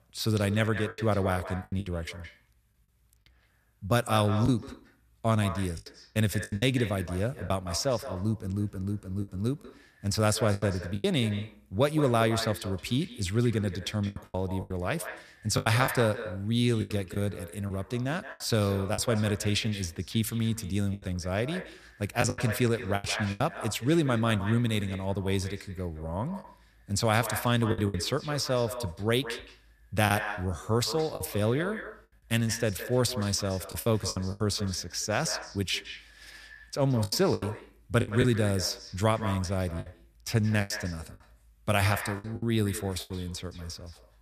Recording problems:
echo of what is said; noticeable; throughout; 170 ms later, 10 dB below the speech
choppy; very; 7% of the speech affected

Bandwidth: 14.5 kHz